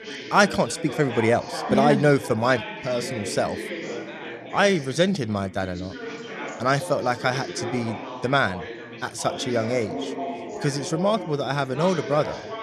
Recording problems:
background chatter; loud; throughout; 3 voices, 10 dB below the speech

